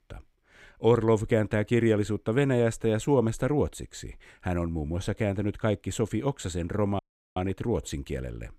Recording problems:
audio cutting out; at 7 s

